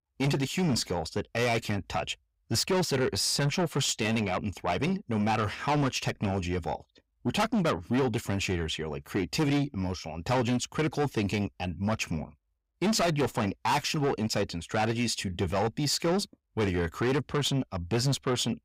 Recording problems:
distortion; heavy; 6 dB below the speech

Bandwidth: 15.5 kHz